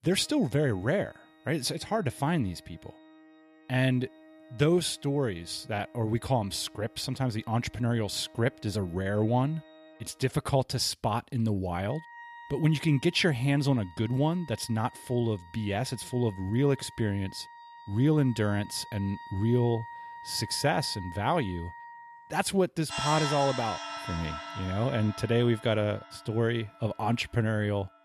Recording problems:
background music; noticeable; throughout; 15 dB below the speech

